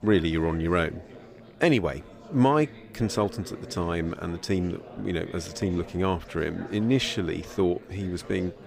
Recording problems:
chatter from many people; noticeable; throughout; 15 dB below the speech

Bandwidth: 15.5 kHz